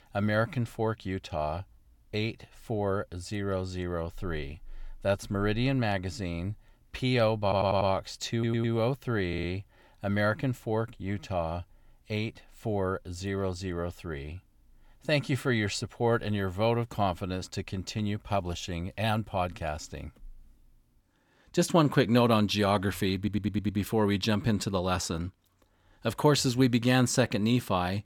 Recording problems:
audio stuttering; 4 times, first at 7.5 s

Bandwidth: 17.5 kHz